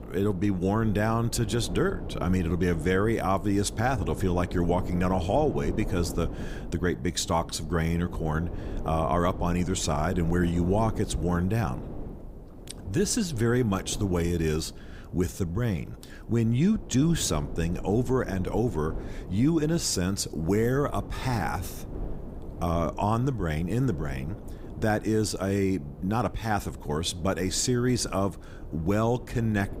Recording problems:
wind noise on the microphone; occasional gusts; 15 dB below the speech

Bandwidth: 15.5 kHz